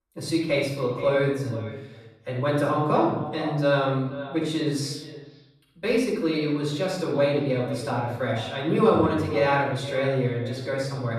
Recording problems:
off-mic speech; far
echo of what is said; noticeable; throughout; 480 ms later, 15 dB below the speech
room echo; noticeable; dies away in 0.7 s

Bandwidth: 13.5 kHz